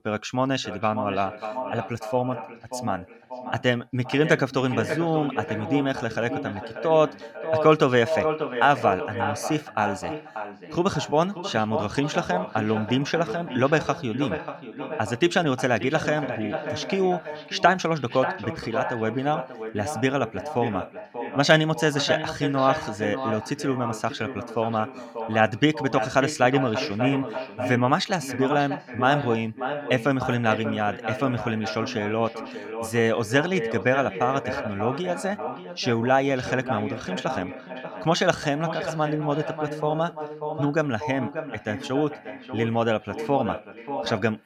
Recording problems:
echo of what is said; strong; throughout; 590 ms later, 8 dB below the speech

